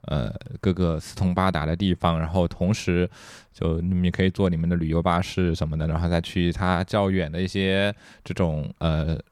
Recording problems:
none

